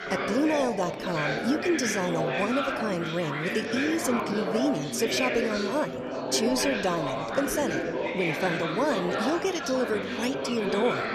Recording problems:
chatter from many people; loud; throughout; 1 dB below the speech

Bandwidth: 14.5 kHz